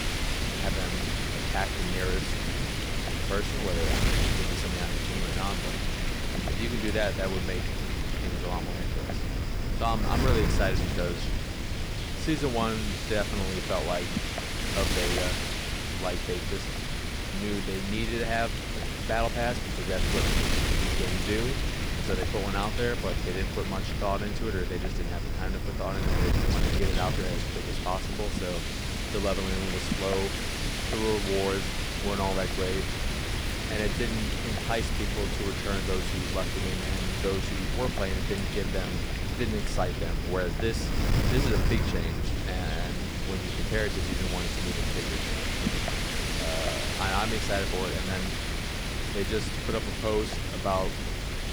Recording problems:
wind noise on the microphone; heavy; 1 dB above the speech

